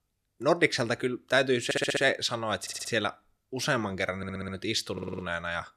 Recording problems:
audio stuttering; 4 times, first at 1.5 s

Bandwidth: 14 kHz